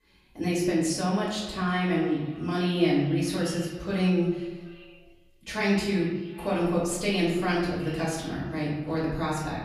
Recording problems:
off-mic speech; far
room echo; noticeable; dies away in 0.9 s
echo of what is said; faint; throughout; 380 ms later, 20 dB below the speech

